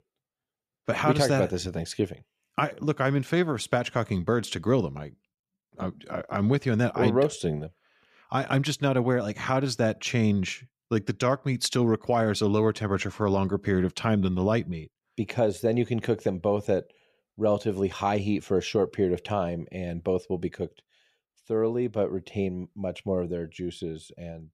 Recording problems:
none

